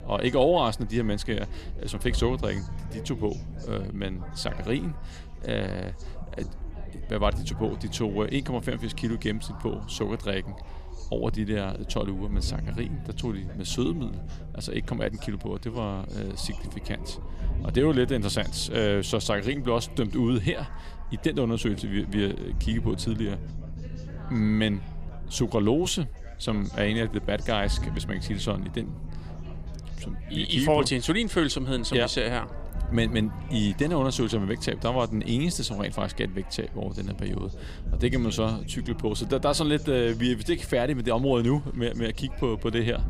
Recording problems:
background chatter; faint; throughout; 4 voices, 20 dB below the speech
low rumble; faint; throughout; 20 dB below the speech

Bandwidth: 15 kHz